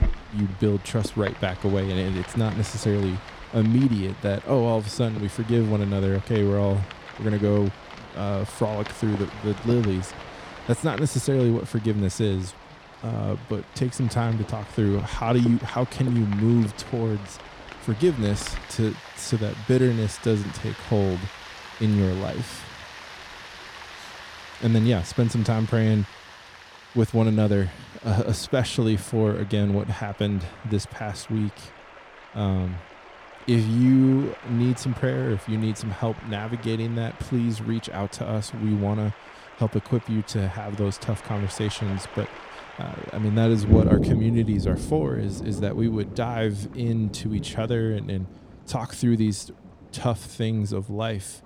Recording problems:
rain or running water; noticeable; throughout; 10 dB below the speech

